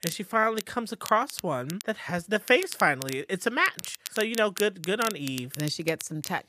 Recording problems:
crackle, like an old record; noticeable; 10 dB below the speech

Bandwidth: 14.5 kHz